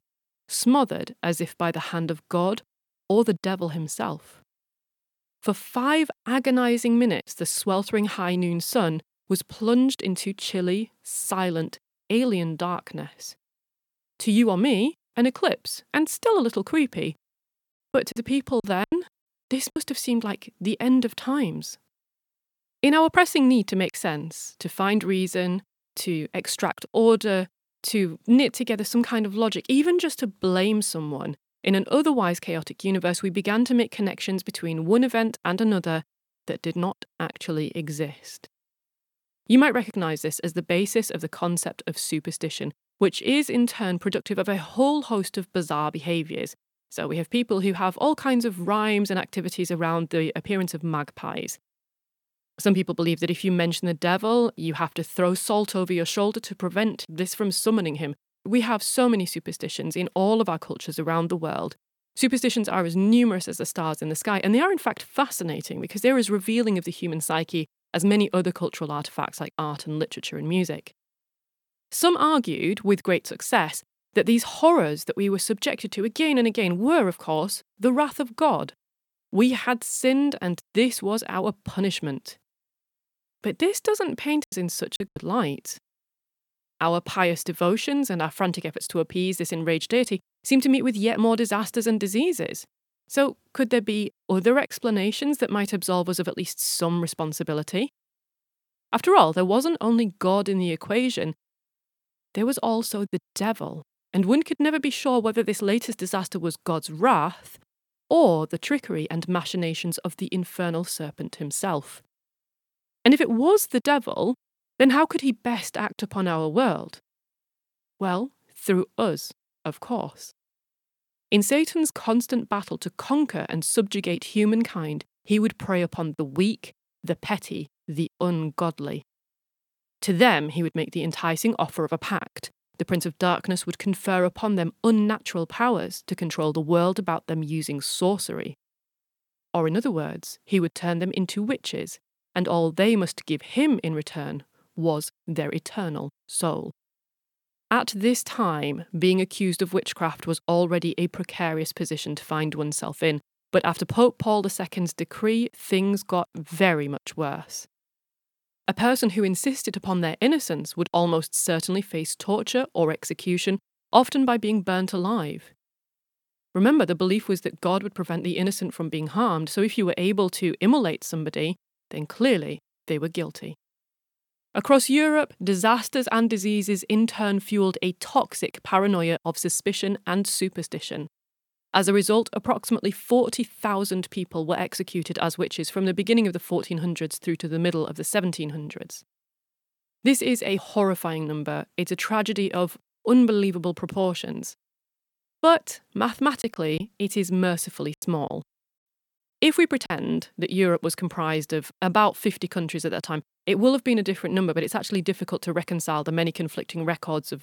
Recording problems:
choppy; very; from 18 to 20 s, at 1:24 and from 3:16 to 3:20; 13% of the speech affected

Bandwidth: 18 kHz